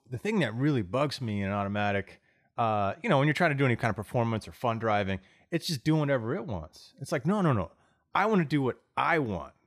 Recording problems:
none

